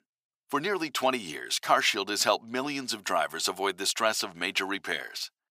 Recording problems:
thin; very; fading below 650 Hz

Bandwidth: 15.5 kHz